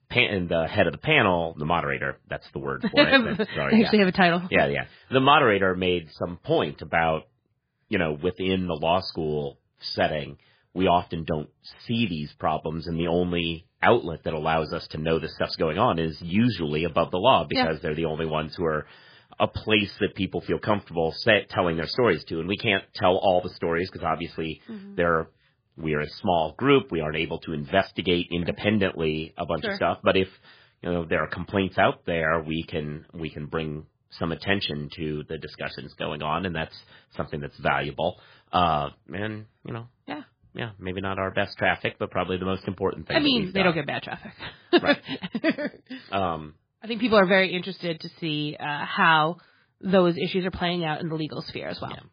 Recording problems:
garbled, watery; badly

